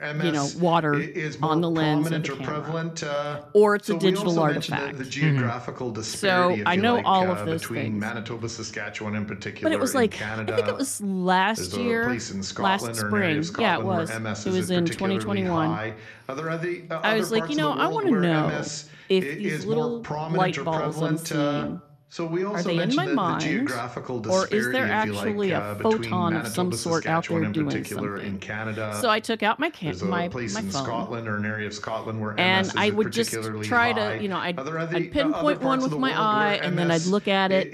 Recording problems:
voice in the background; loud; throughout; 5 dB below the speech

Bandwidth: 13.5 kHz